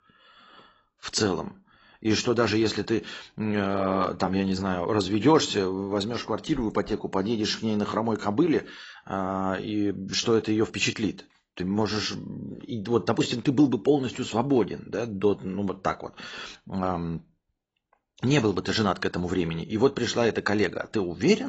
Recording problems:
garbled, watery; badly; nothing above 8 kHz
abrupt cut into speech; at the end

